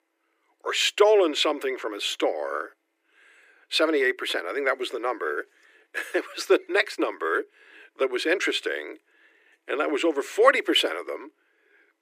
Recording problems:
thin; very; fading below 300 Hz

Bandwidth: 15 kHz